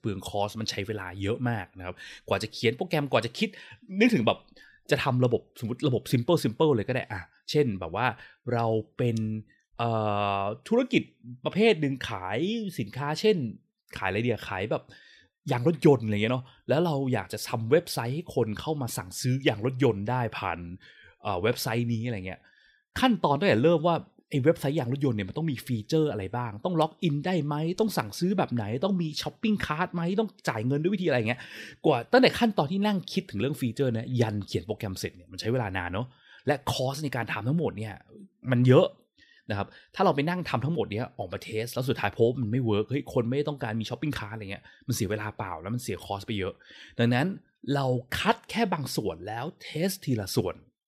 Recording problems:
none

